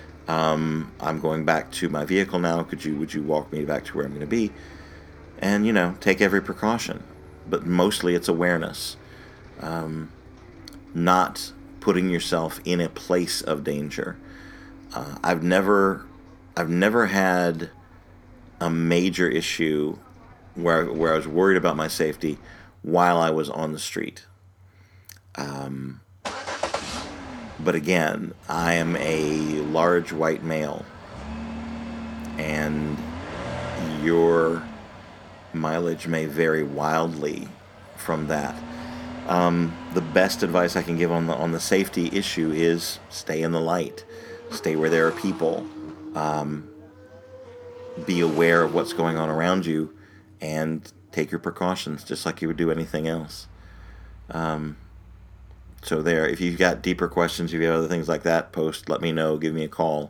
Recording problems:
traffic noise; noticeable; throughout; 15 dB below the speech

